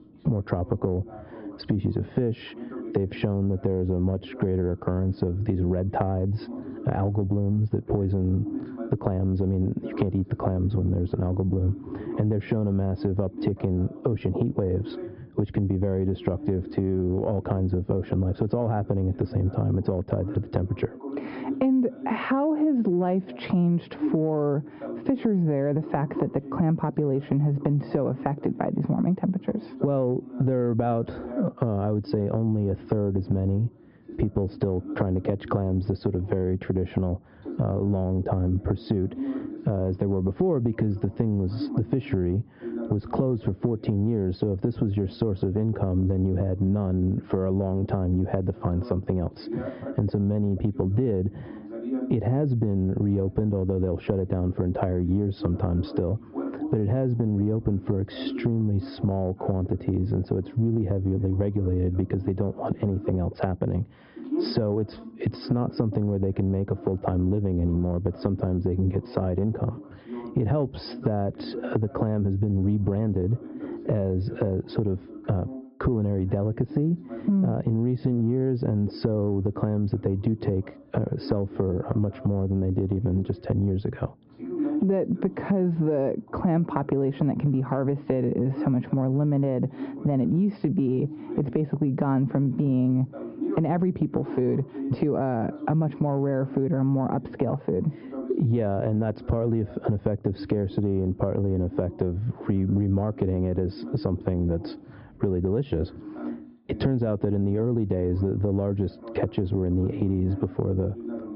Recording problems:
squashed, flat; heavily, background pumping
high frequencies cut off; noticeable; nothing above 5.5 kHz
muffled; very slightly; fading above 1 kHz
voice in the background; noticeable; throughout; 15 dB below the speech

